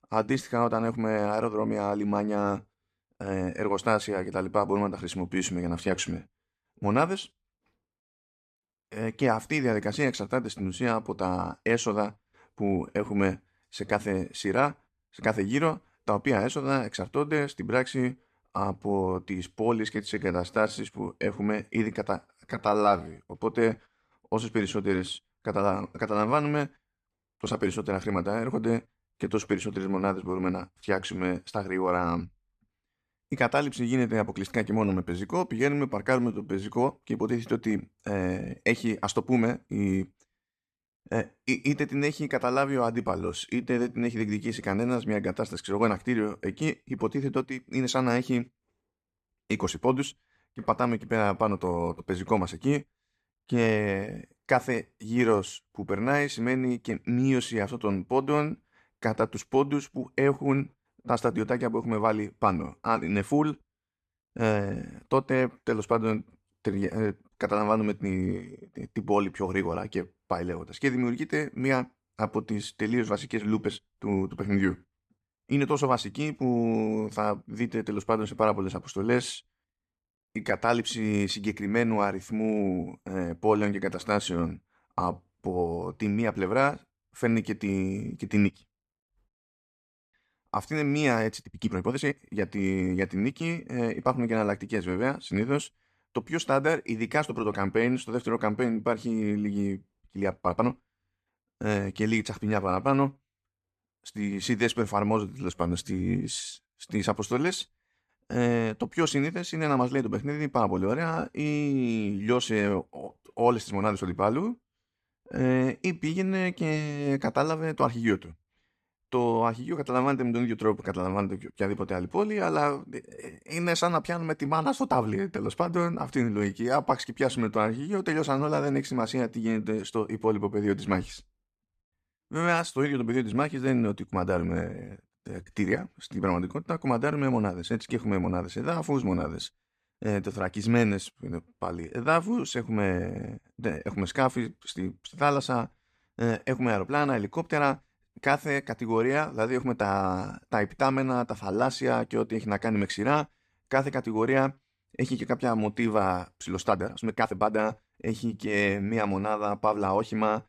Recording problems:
uneven, jittery; strongly; from 20 s to 2:39

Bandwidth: 14.5 kHz